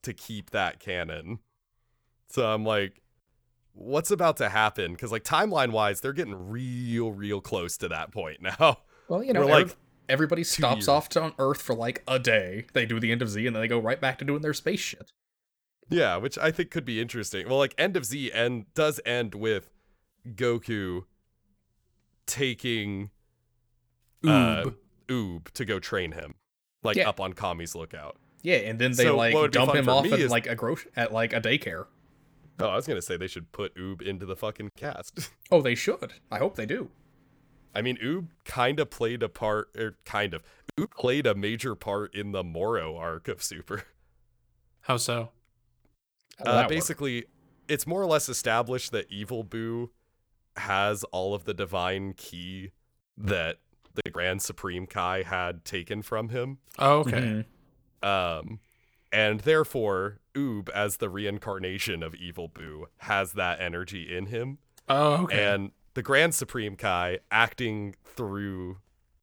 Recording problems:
none

